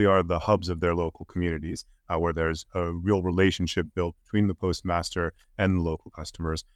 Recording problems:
abrupt cut into speech; at the start

